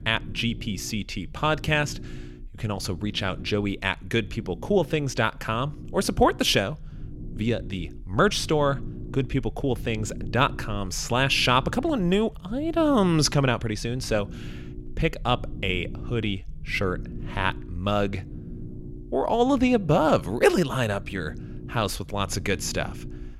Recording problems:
low rumble; faint; throughout; 20 dB below the speech

